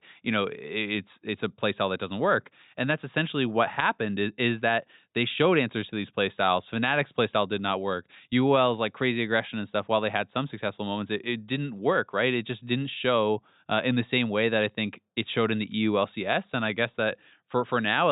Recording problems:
high frequencies cut off; severe; nothing above 4 kHz
abrupt cut into speech; at the end

